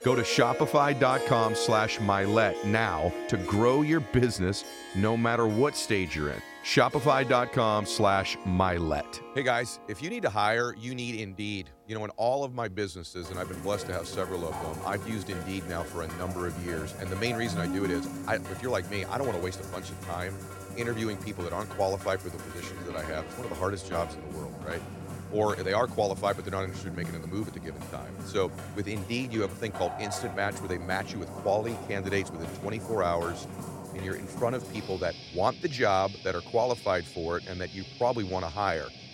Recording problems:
background music; loud; throughout; 9 dB below the speech

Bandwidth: 16.5 kHz